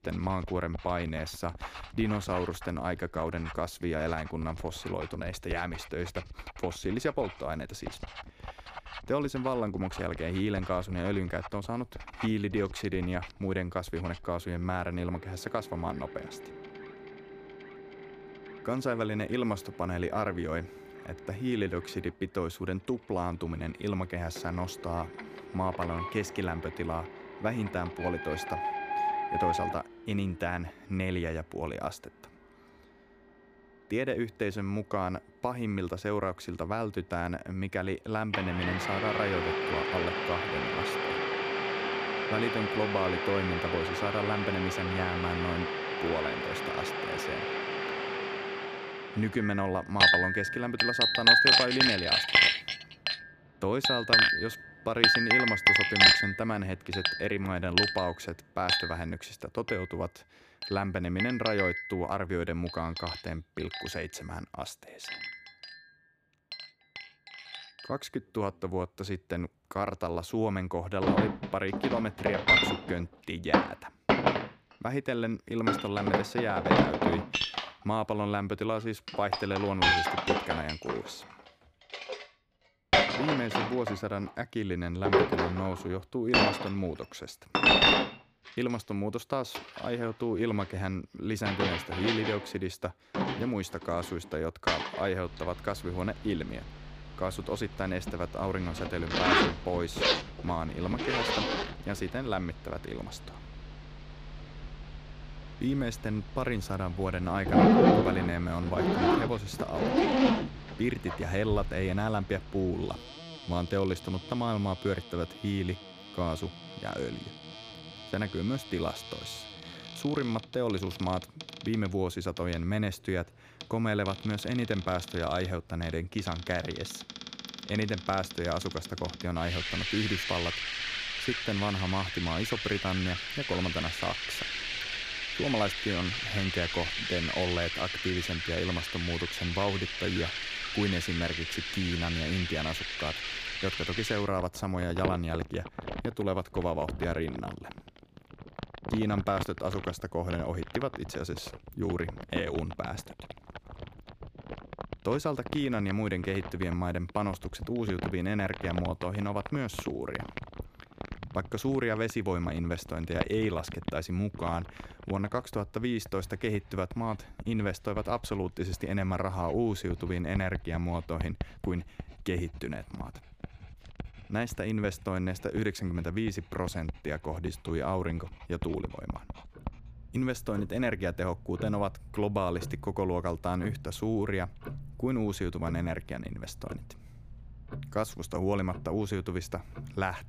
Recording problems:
household noises; very loud; throughout; 4 dB above the speech

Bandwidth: 15 kHz